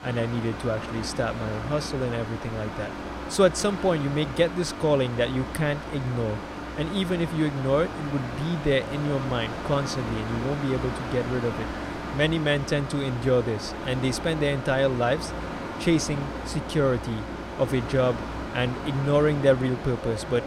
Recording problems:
machinery noise; loud; throughout; 8 dB below the speech

